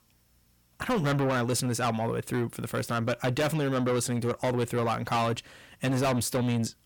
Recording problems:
distortion; heavy; 6 dB below the speech

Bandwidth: 18 kHz